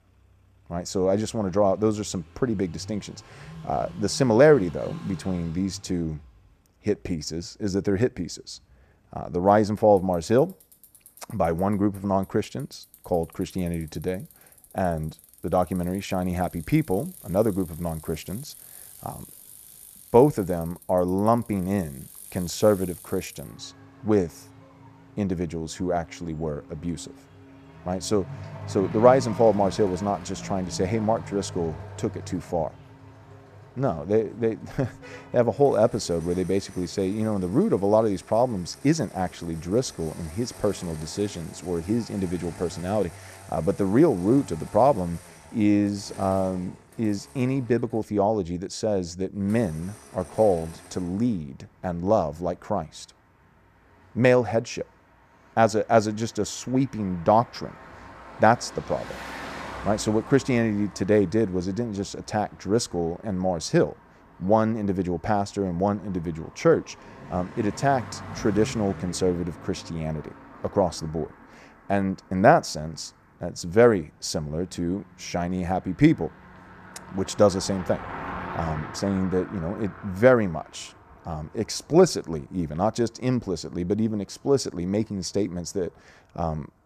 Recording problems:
traffic noise; noticeable; throughout; 20 dB below the speech

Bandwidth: 14.5 kHz